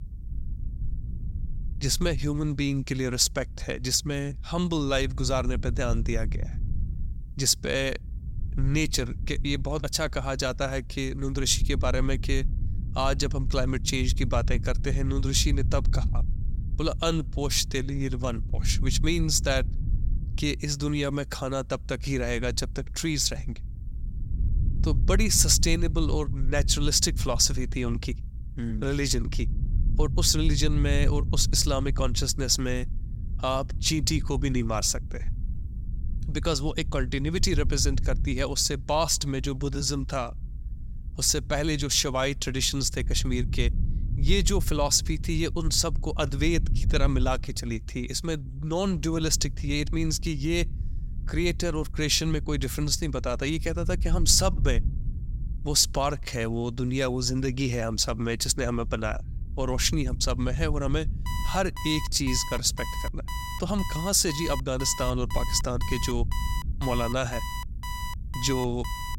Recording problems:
low rumble; faint; throughout; 20 dB below the speech
alarm; noticeable; from 1:01 on; peak 9 dB below the speech

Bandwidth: 16 kHz